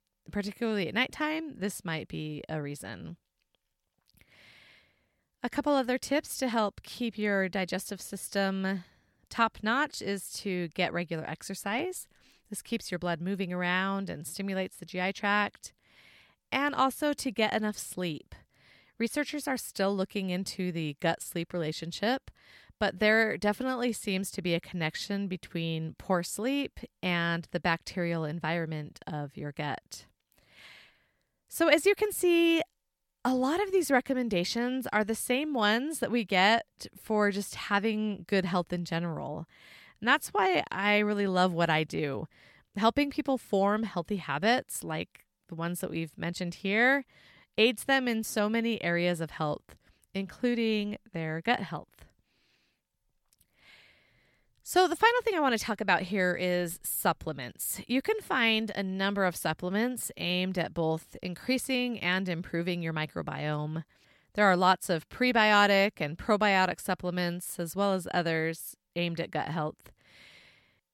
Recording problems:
none

